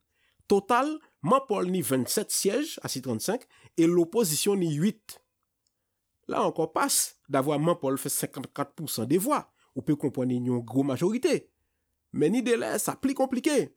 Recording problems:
none

